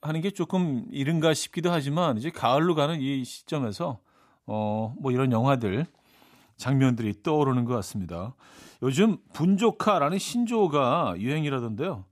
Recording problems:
none

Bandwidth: 14.5 kHz